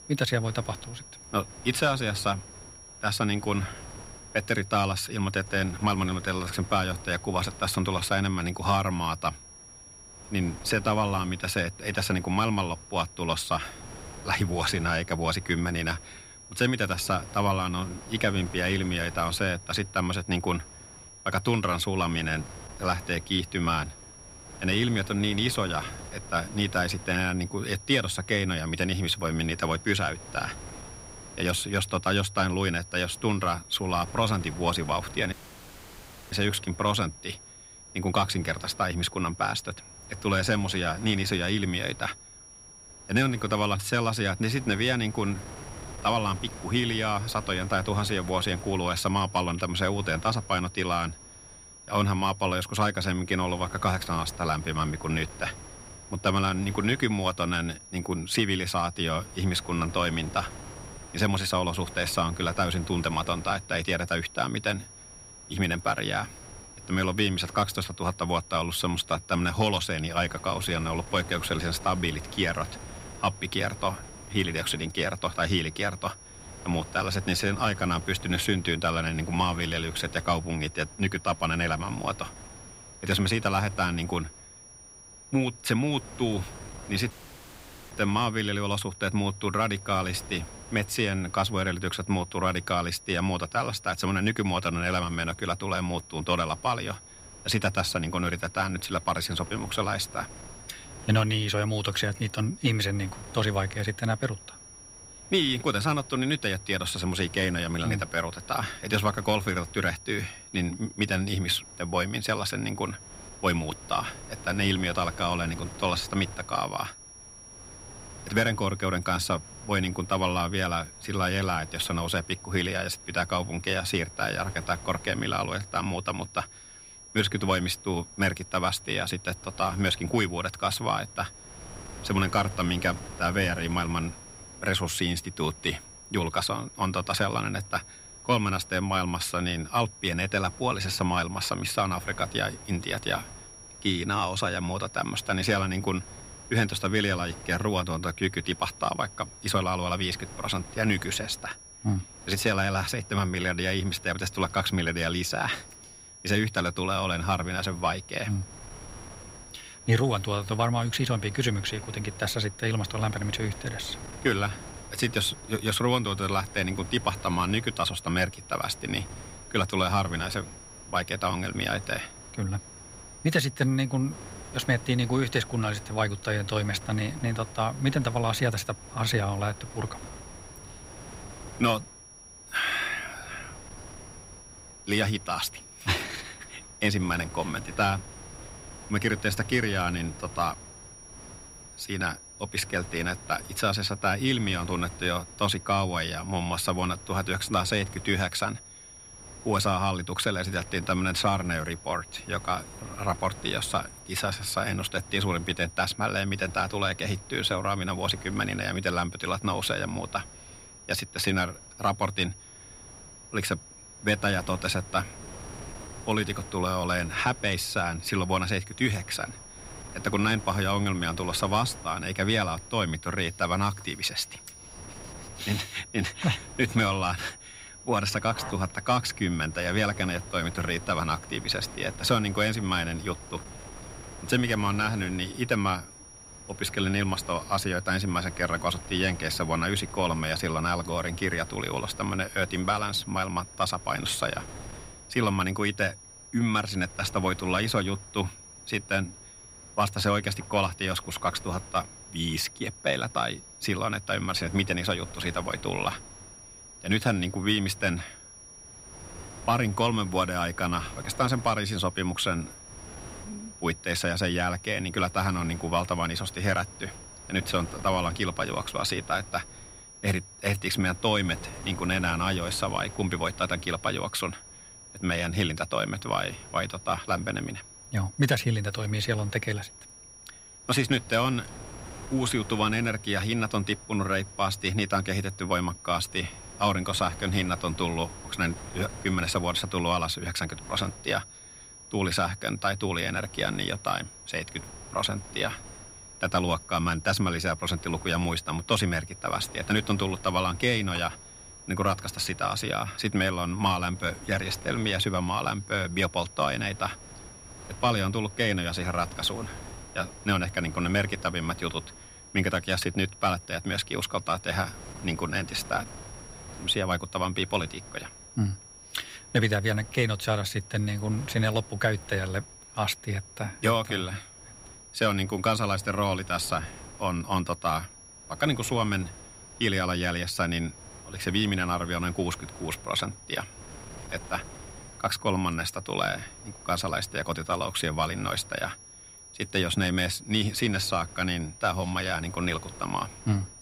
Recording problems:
high-pitched whine; noticeable; throughout; 5.5 kHz, 20 dB below the speech
wind noise on the microphone; occasional gusts; 20 dB below the speech
audio cutting out; at 35 s for 1 s and at 1:27 for 1 s

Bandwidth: 15.5 kHz